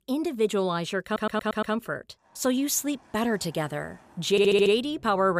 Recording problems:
traffic noise; faint; from 2 s on; 30 dB below the speech
audio stuttering; at 1 s and at 4.5 s
abrupt cut into speech; at the end

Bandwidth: 15 kHz